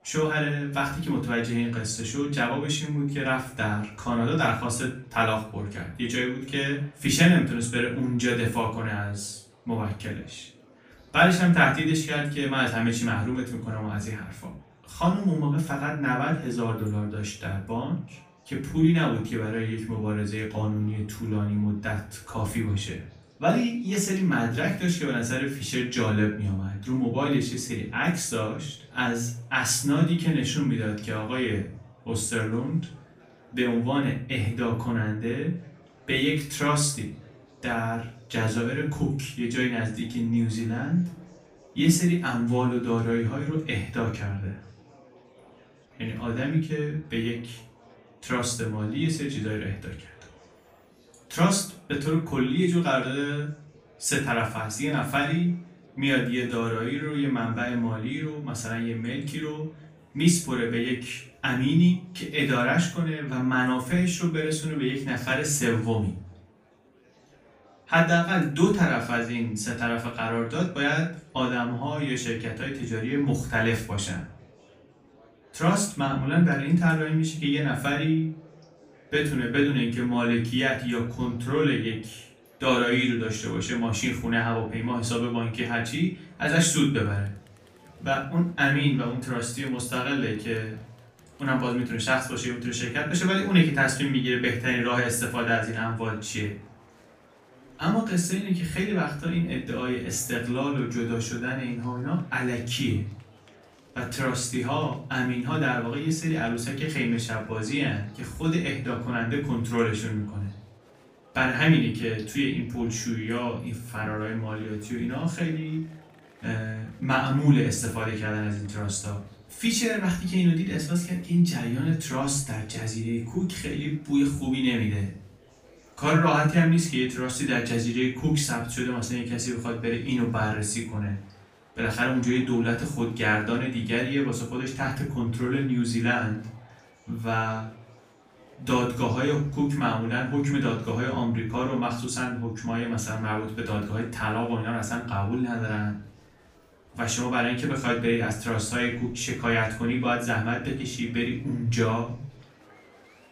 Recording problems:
off-mic speech; far
room echo; slight; dies away in 0.4 s
murmuring crowd; faint; throughout; 30 dB below the speech

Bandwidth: 15 kHz